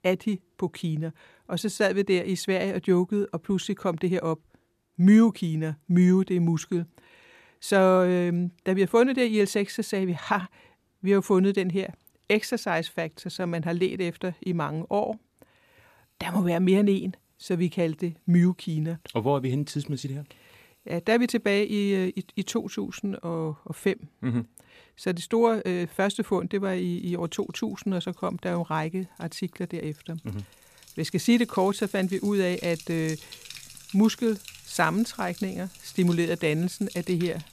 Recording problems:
household noises; faint; throughout; 20 dB below the speech
uneven, jittery; slightly; from 1.5 to 33 s

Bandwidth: 14.5 kHz